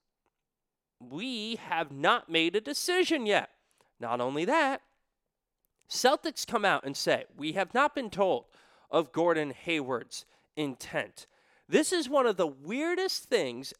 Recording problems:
none

